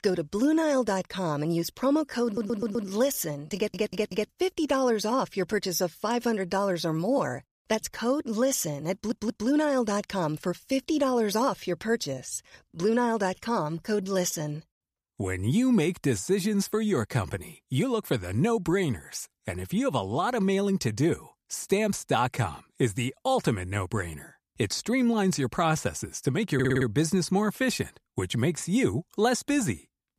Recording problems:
audio stuttering; 4 times, first at 2.5 s

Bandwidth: 14.5 kHz